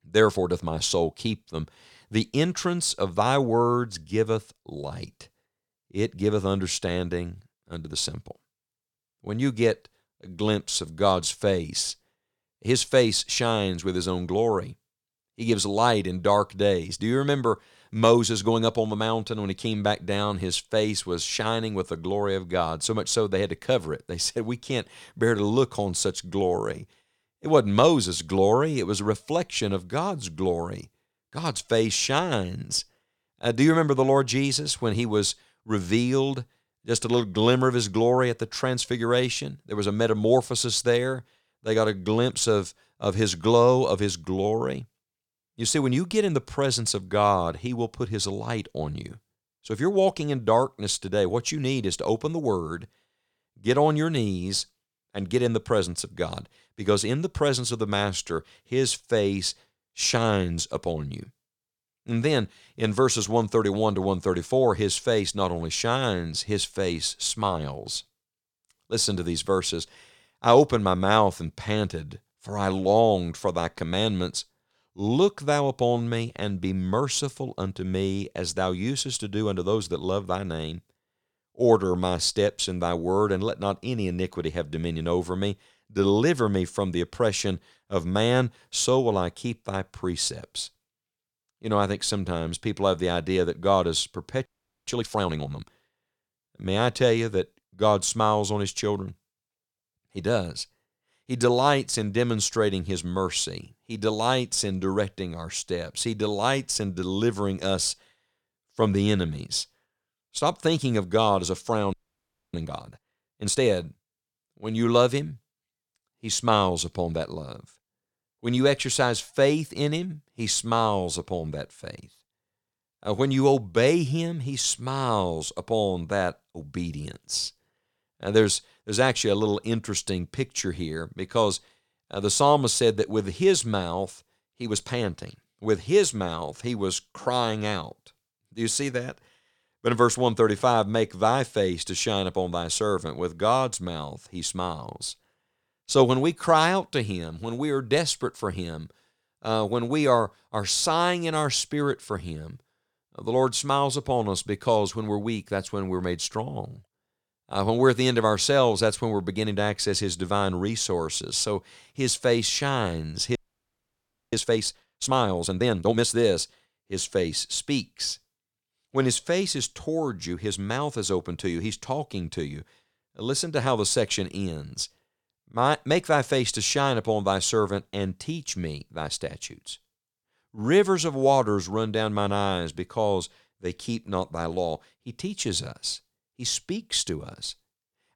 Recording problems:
audio freezing; at 1:34, at 1:52 for 0.5 s and at 2:43 for 1 s

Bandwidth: 17.5 kHz